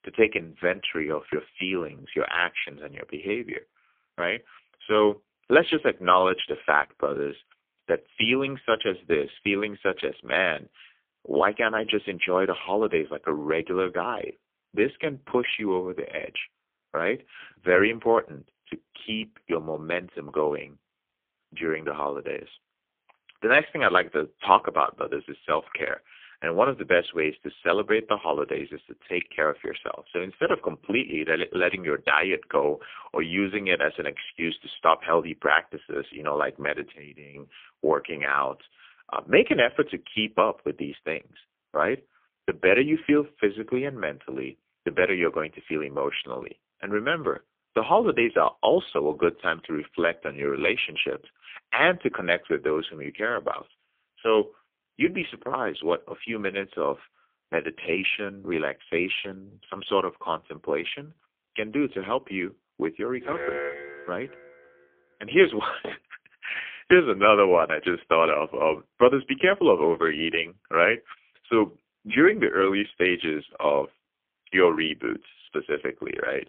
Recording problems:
phone-call audio; poor line; nothing above 3.5 kHz
alarm; noticeable; from 1:03 to 1:04; peak 5 dB below the speech

